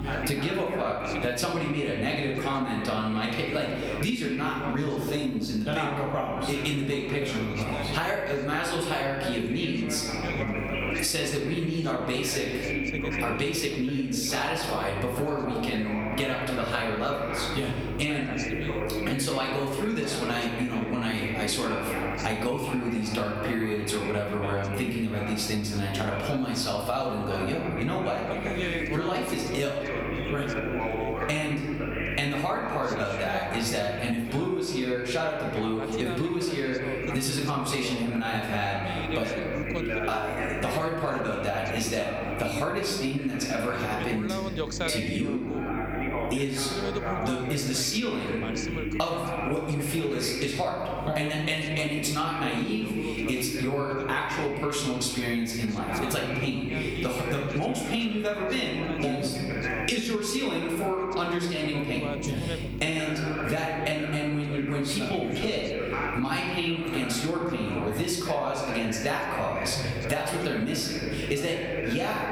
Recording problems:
off-mic speech; far
room echo; noticeable; dies away in 0.9 s
squashed, flat; somewhat, background pumping
background chatter; loud; throughout; 2 voices, 6 dB below the speech
electrical hum; faint; throughout; 50 Hz, 20 dB below the speech

